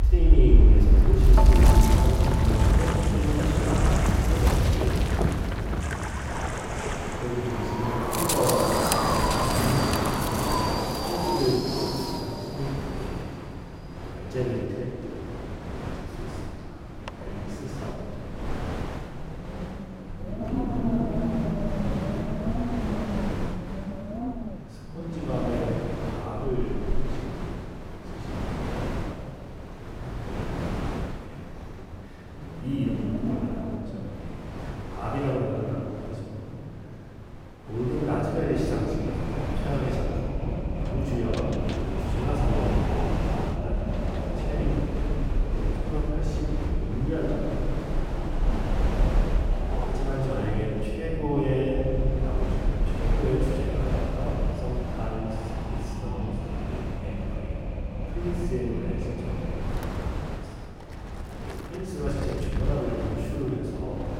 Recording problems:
room echo; strong; dies away in 2.7 s
off-mic speech; far
wind in the background; very loud; throughout; 3 dB above the speech

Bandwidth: 16 kHz